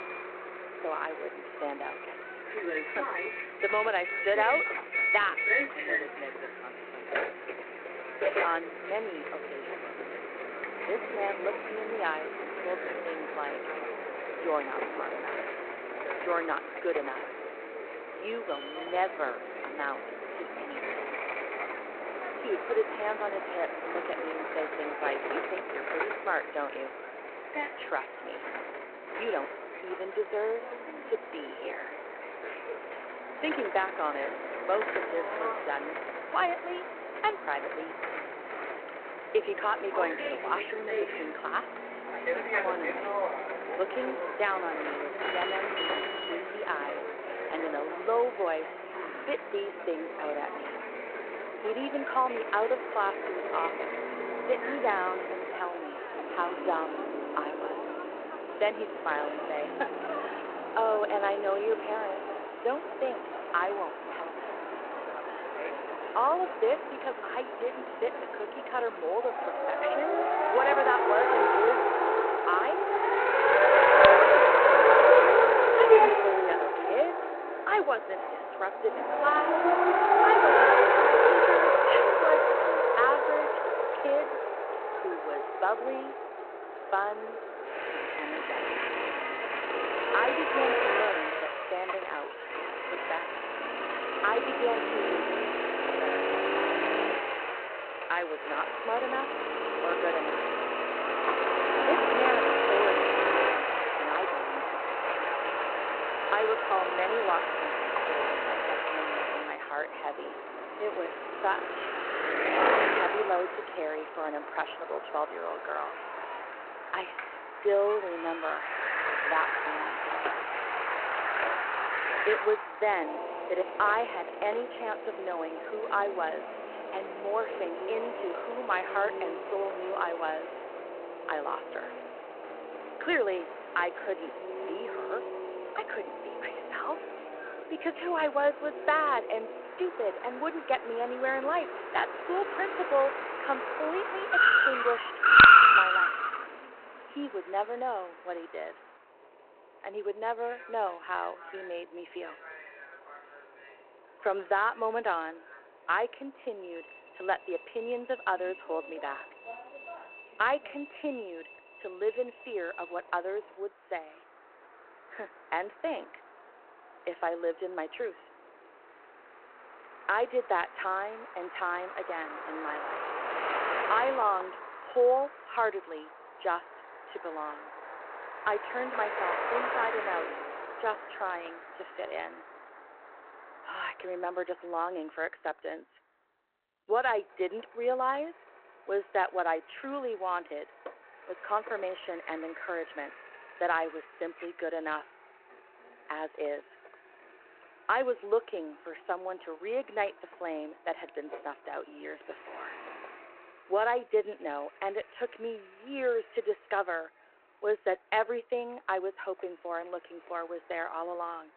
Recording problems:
phone-call audio
traffic noise; very loud; throughout; 4 dB above the speech

